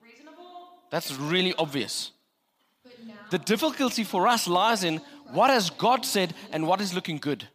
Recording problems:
voice in the background; faint; throughout; 25 dB below the speech

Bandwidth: 15 kHz